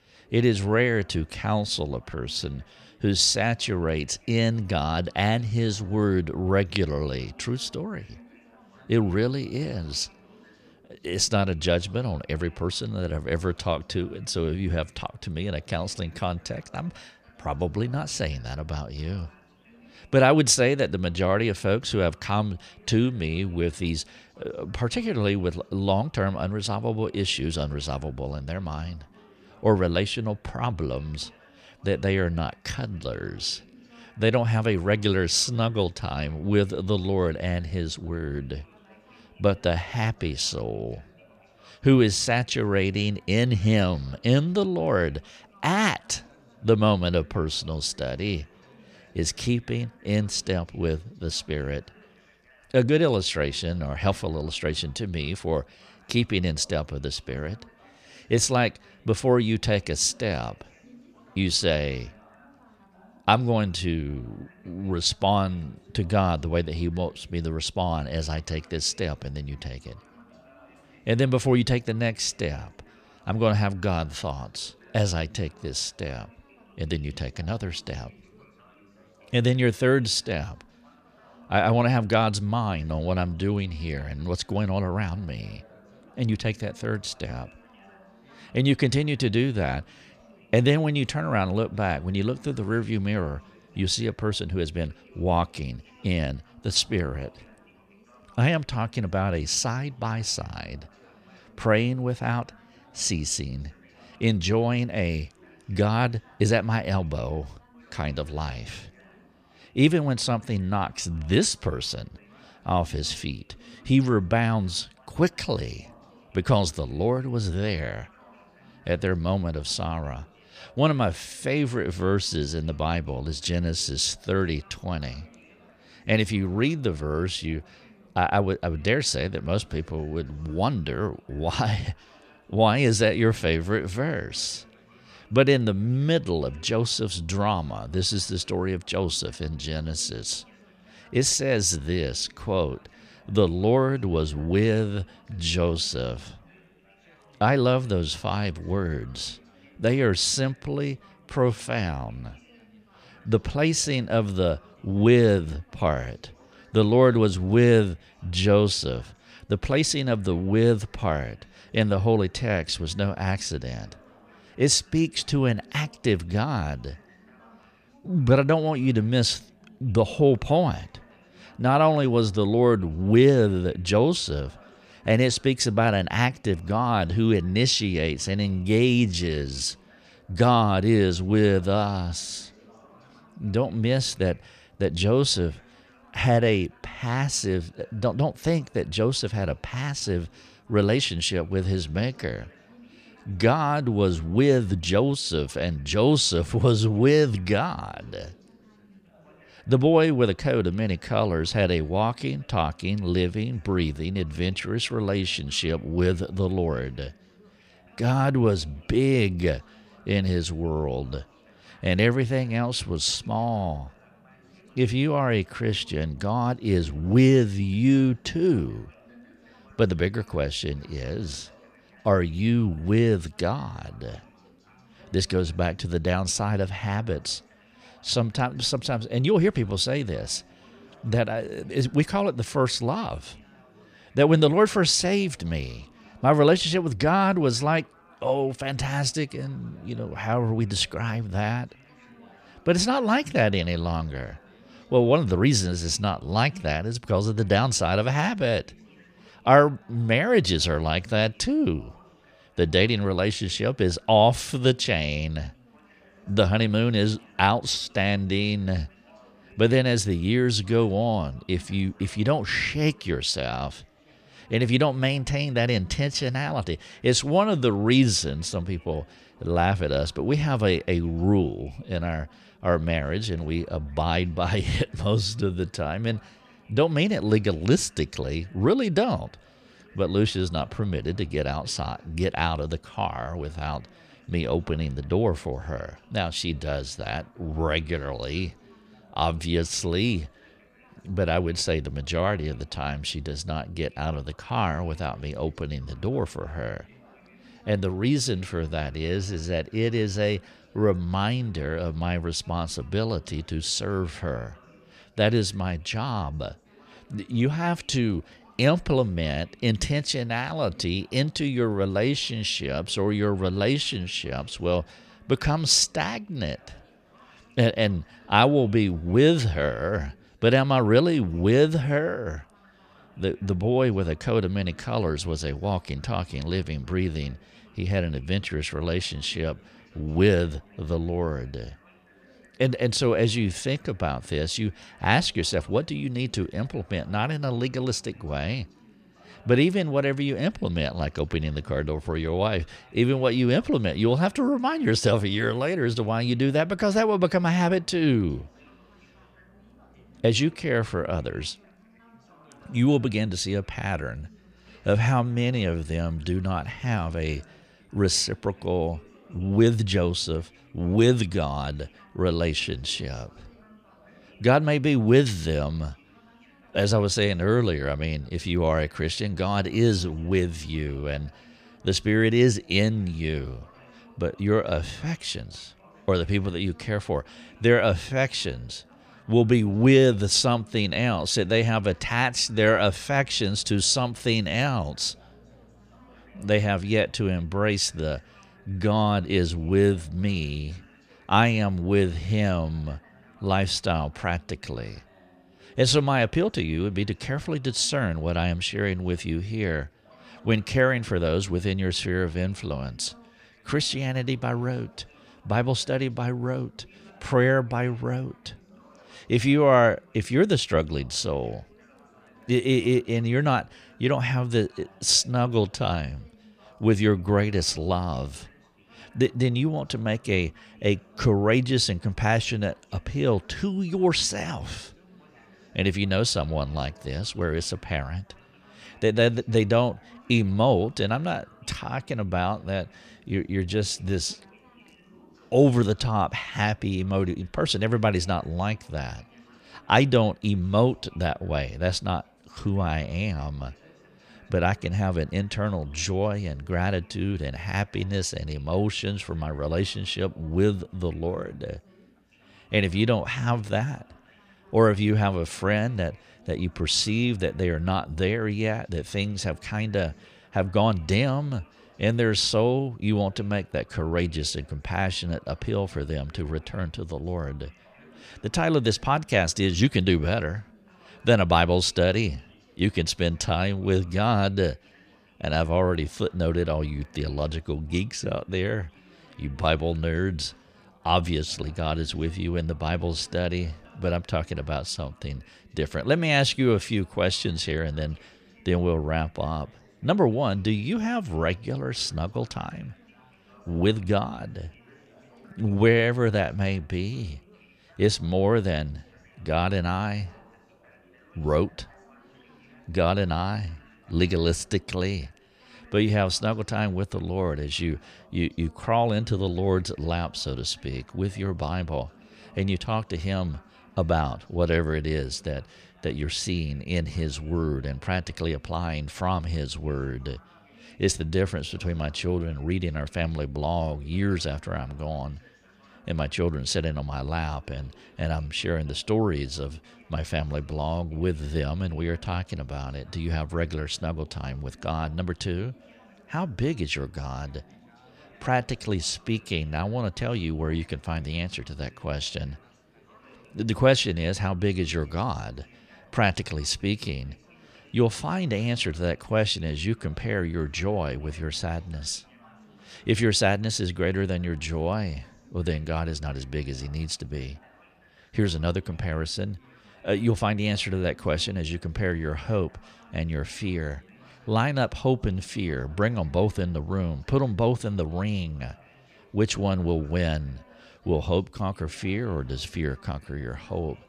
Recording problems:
background chatter; faint; throughout; 4 voices, 30 dB below the speech

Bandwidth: 14.5 kHz